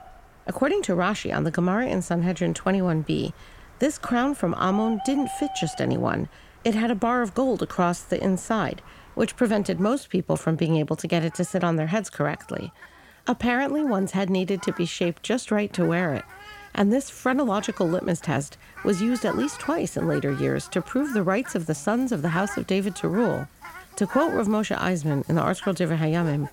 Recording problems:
animal sounds; noticeable; throughout; 15 dB below the speech

